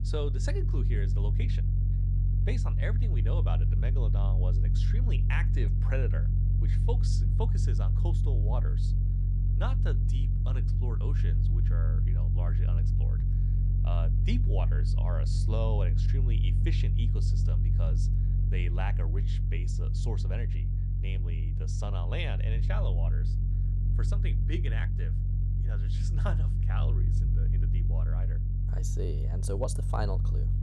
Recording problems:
low rumble; loud; throughout; 3 dB below the speech

